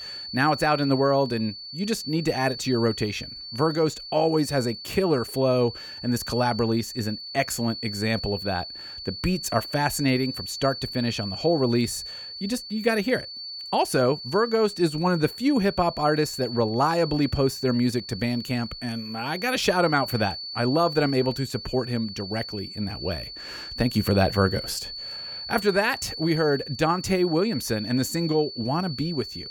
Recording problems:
high-pitched whine; loud; throughout; 4.5 kHz, 9 dB below the speech

